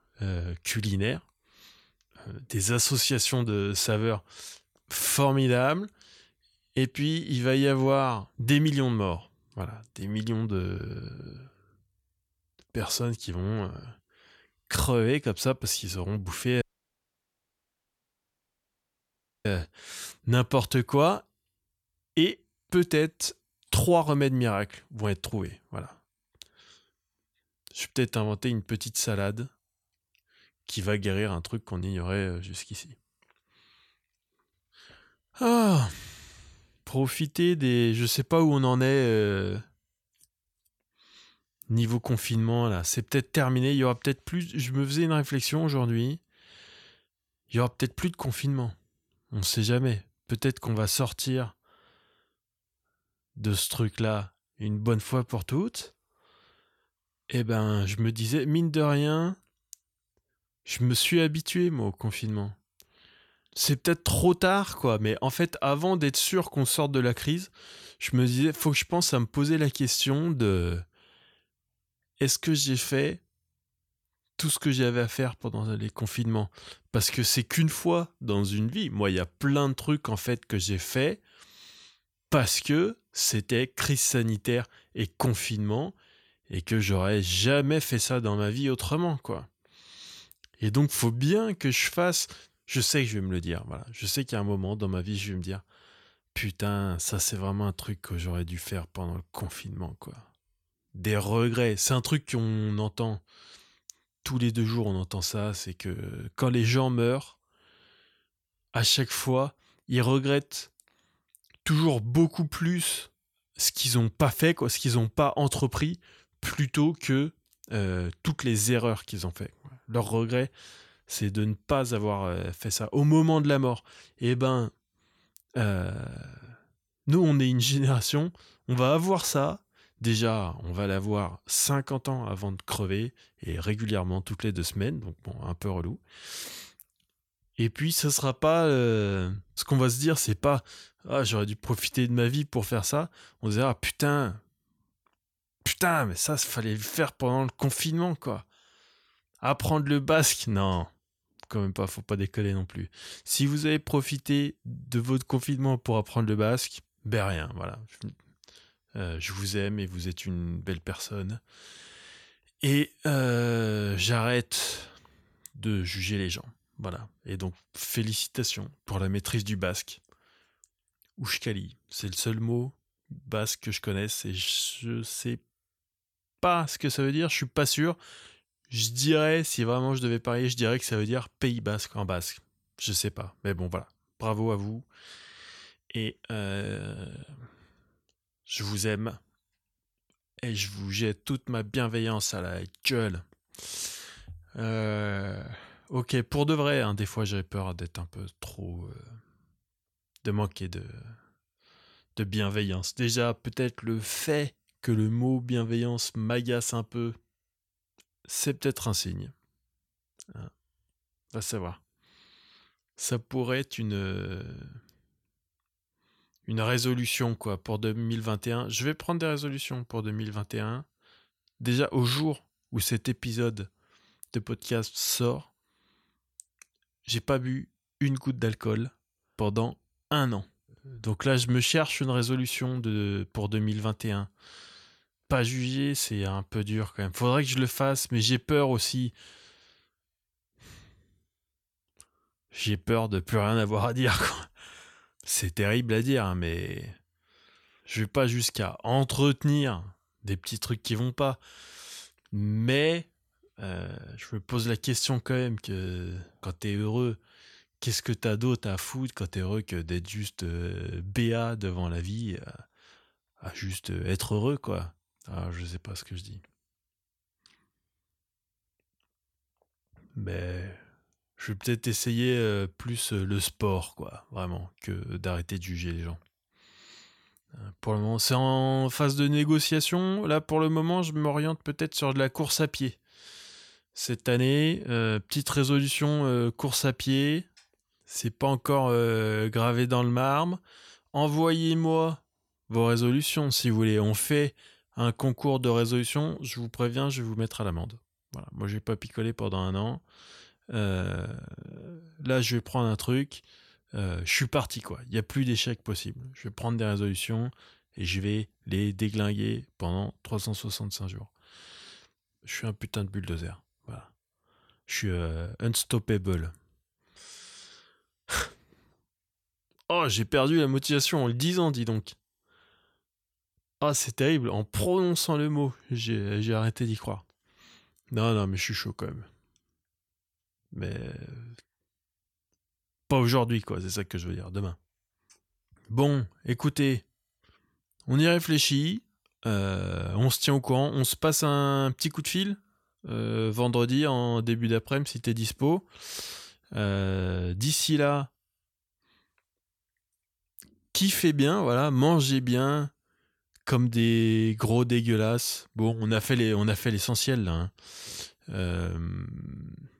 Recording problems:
audio cutting out; at 17 s for 3 s

